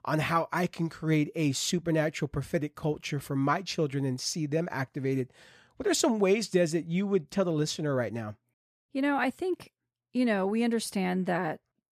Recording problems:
none

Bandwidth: 14.5 kHz